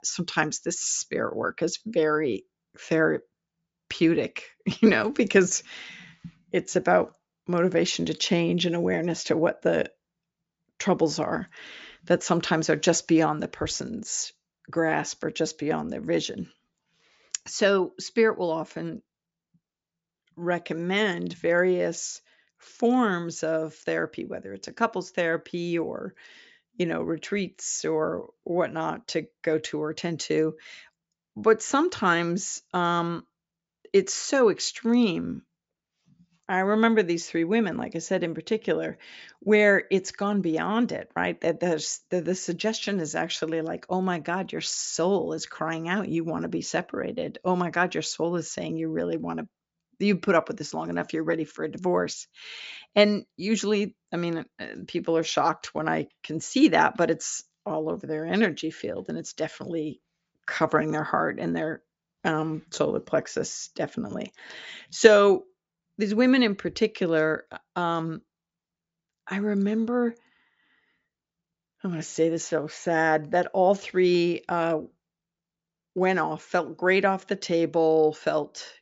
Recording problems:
high frequencies cut off; noticeable; nothing above 8 kHz

